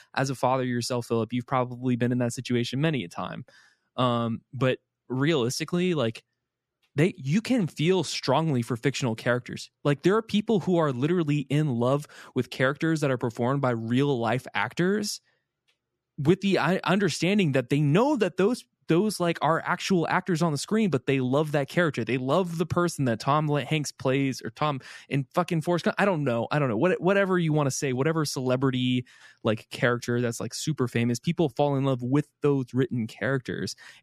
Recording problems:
none

